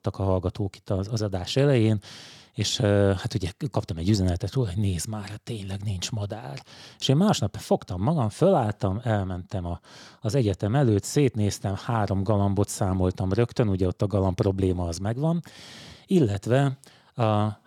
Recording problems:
none

